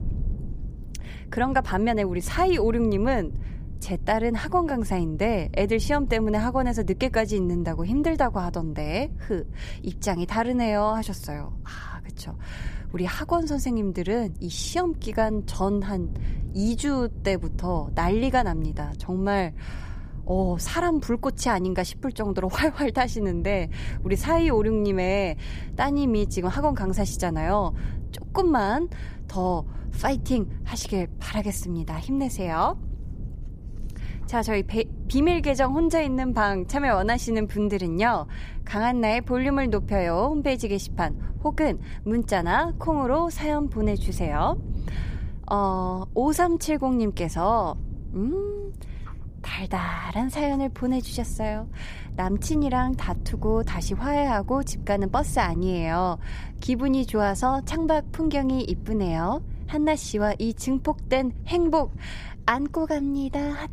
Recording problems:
low rumble; faint; throughout; 25 dB below the speech

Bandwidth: 15 kHz